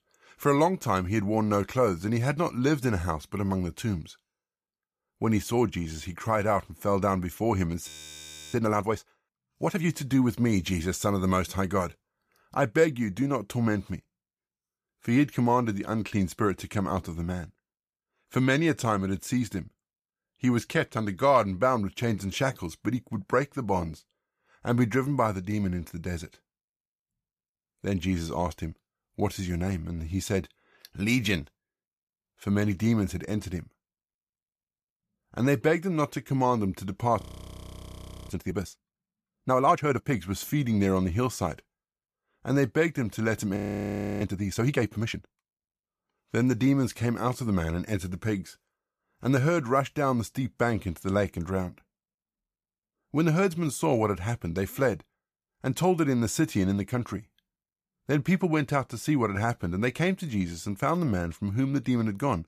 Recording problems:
audio freezing; at 8 s for 0.5 s, at 37 s for 1 s and at 44 s for 0.5 s

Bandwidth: 14.5 kHz